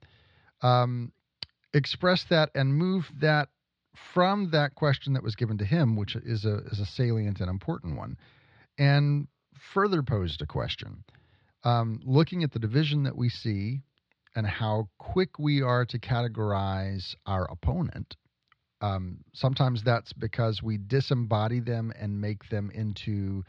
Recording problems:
muffled; very slightly; fading above 4 kHz

